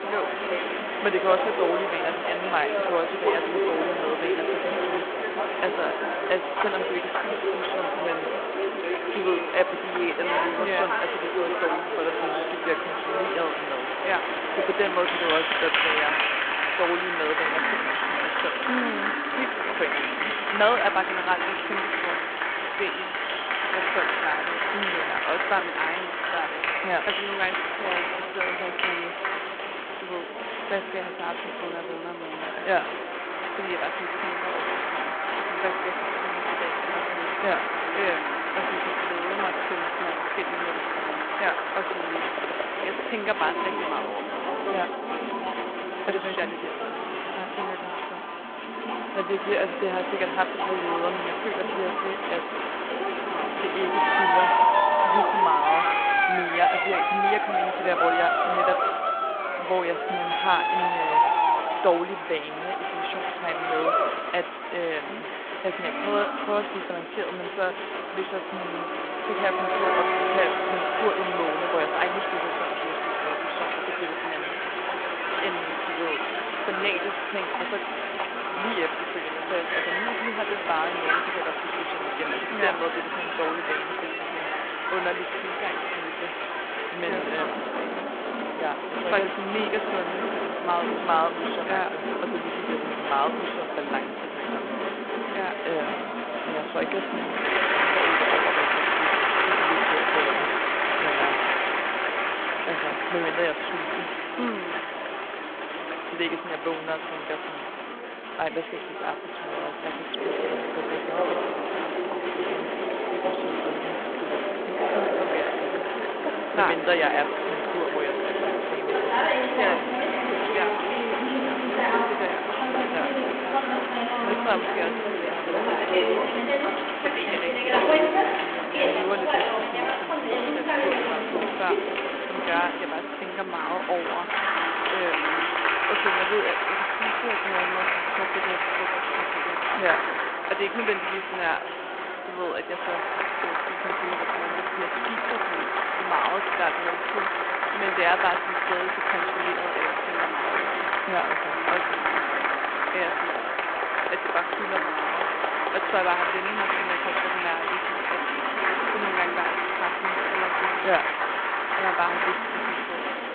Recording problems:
phone-call audio
crowd noise; very loud; throughout; 4 dB above the speech
chatter from many people; loud; throughout; 6 dB below the speech

